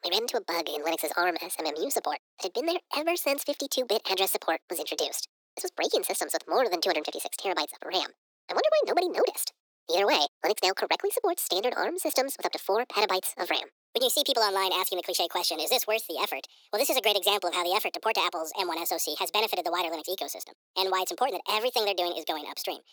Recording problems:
thin; very; fading below 400 Hz
wrong speed and pitch; too fast and too high; 1.6 times normal speed

